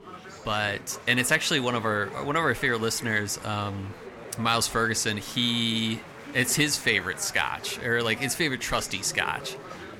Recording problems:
chatter from many people; noticeable; throughout; 15 dB below the speech

